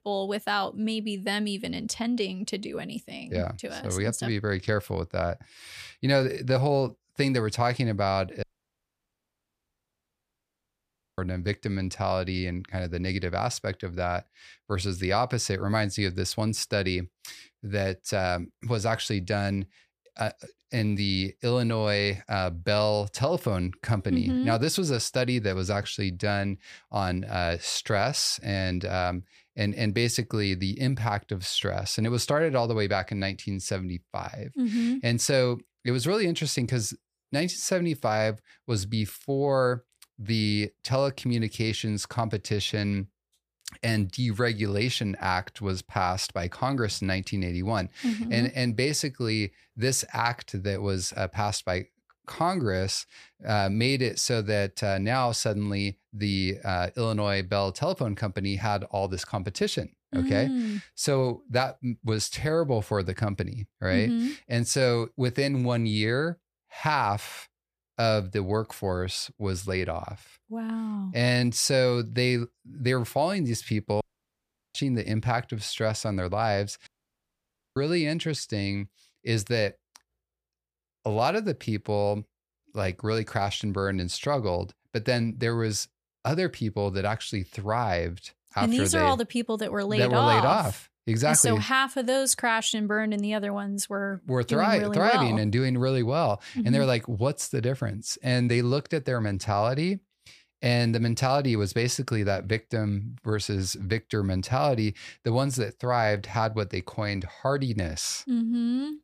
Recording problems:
audio cutting out; at 8.5 s for 3 s, at 1:14 for 0.5 s and at 1:17 for 1 s

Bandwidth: 15 kHz